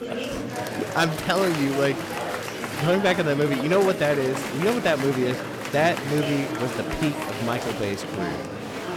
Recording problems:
murmuring crowd; loud; throughout; 5 dB below the speech

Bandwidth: 17 kHz